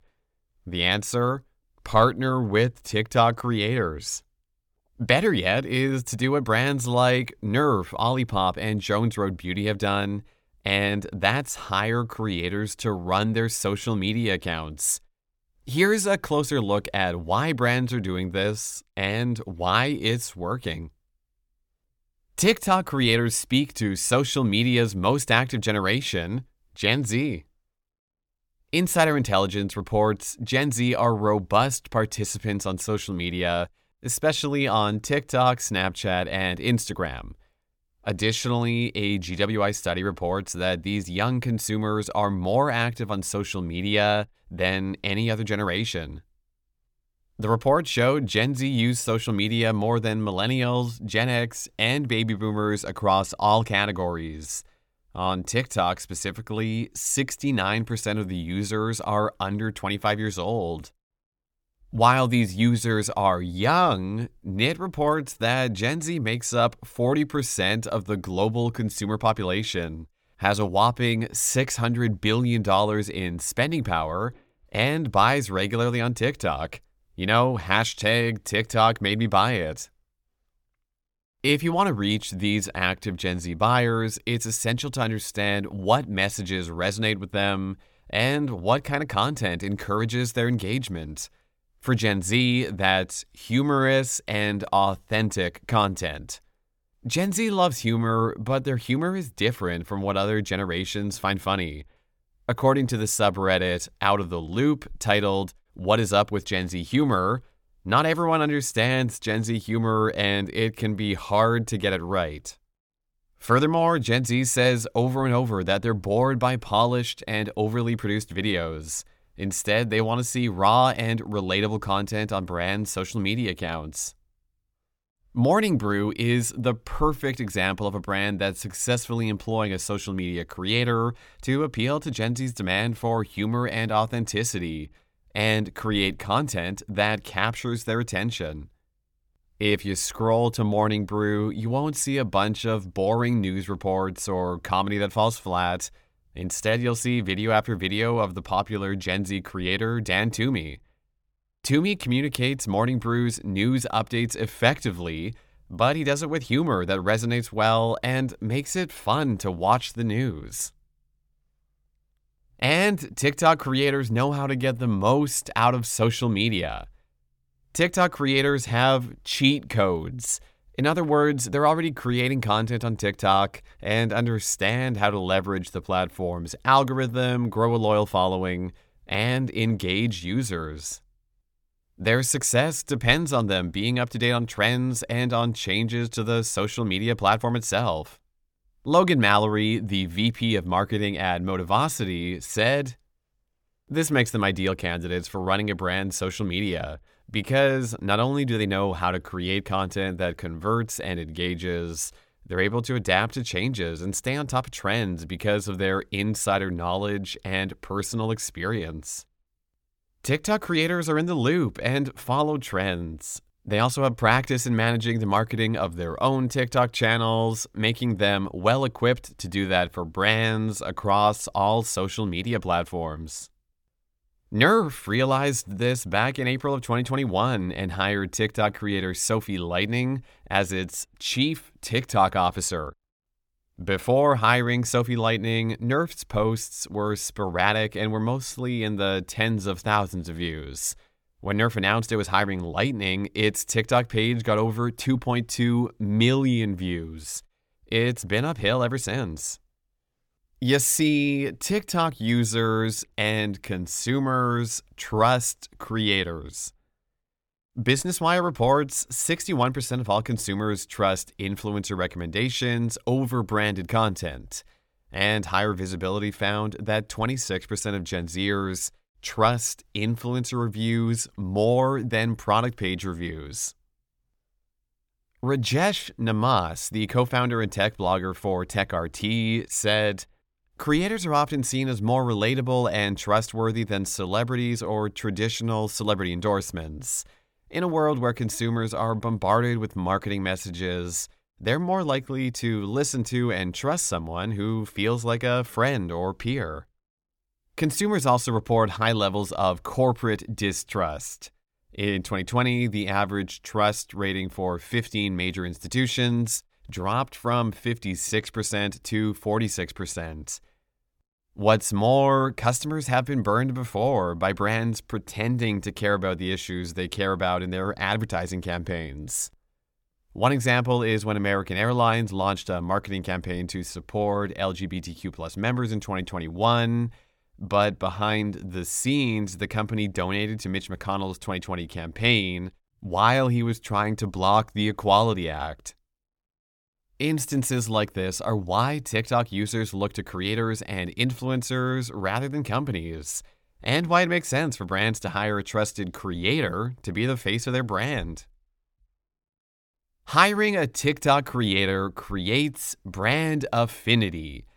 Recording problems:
none

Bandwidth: 18.5 kHz